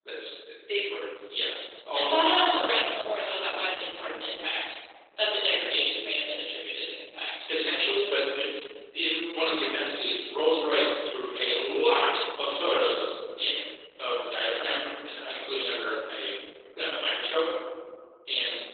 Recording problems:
off-mic speech; far
garbled, watery; badly; nothing above 4 kHz
thin; very; fading below 300 Hz
room echo; noticeable; dies away in 1.4 s

